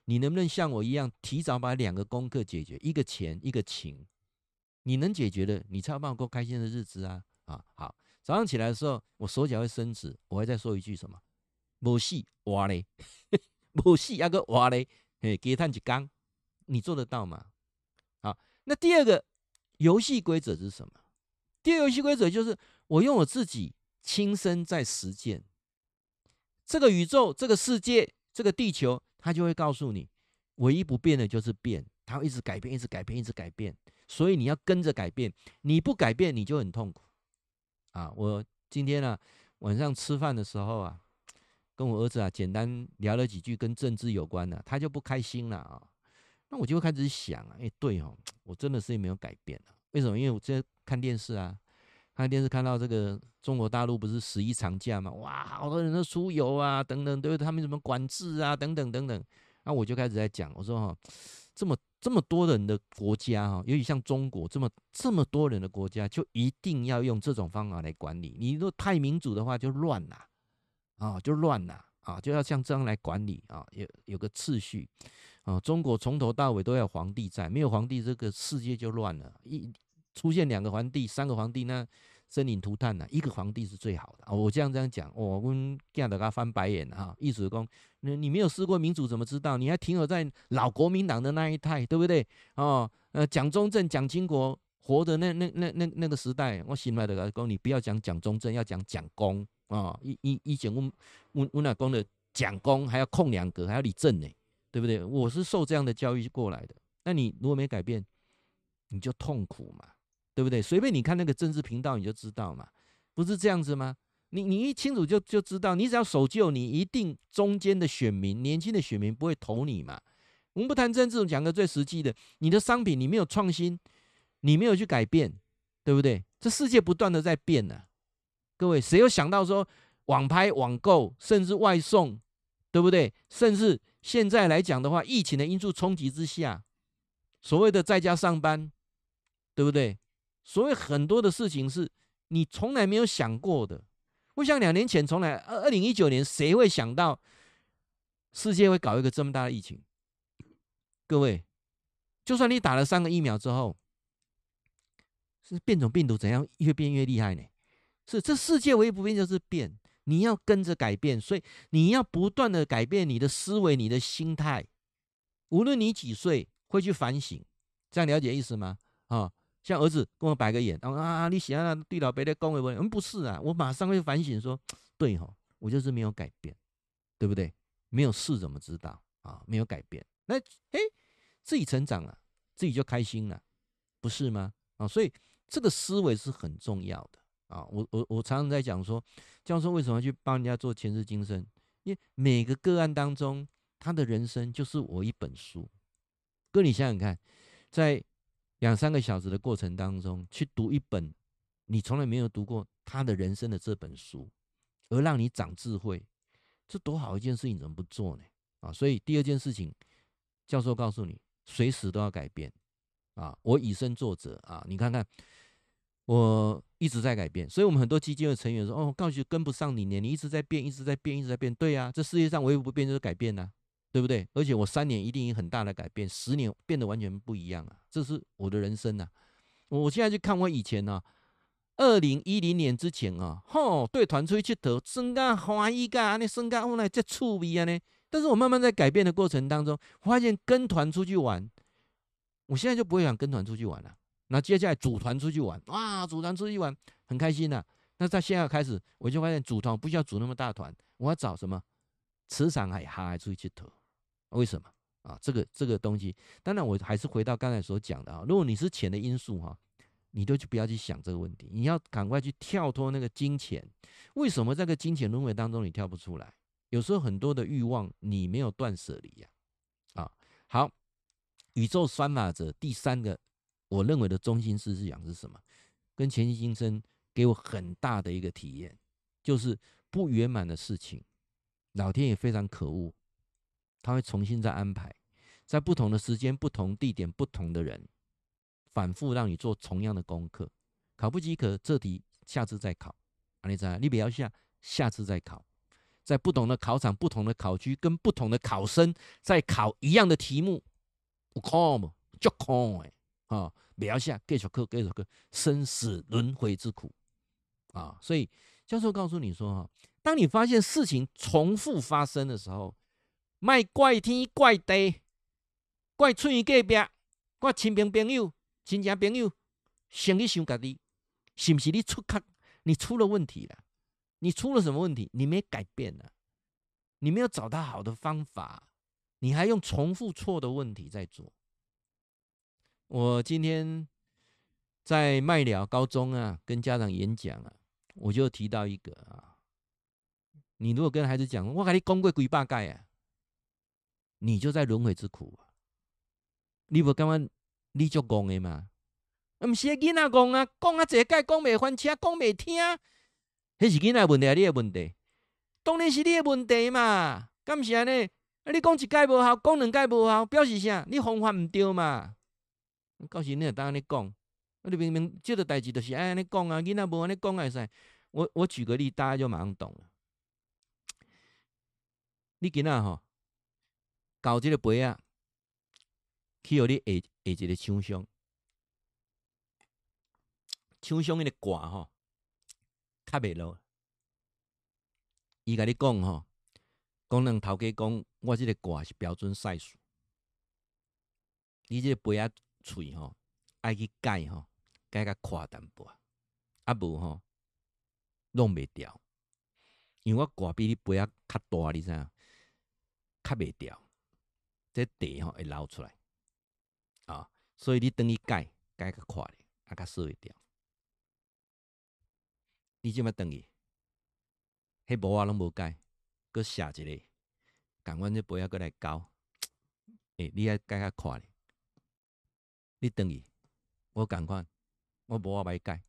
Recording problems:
none

